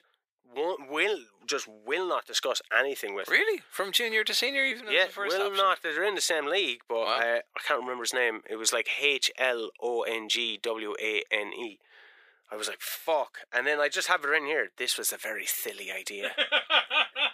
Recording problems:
thin; very; fading below 400 Hz

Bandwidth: 15 kHz